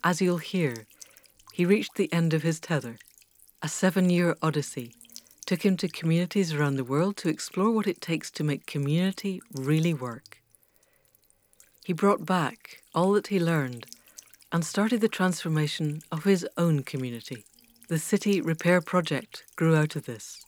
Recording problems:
electrical hum; faint; throughout; 60 Hz, 25 dB below the speech

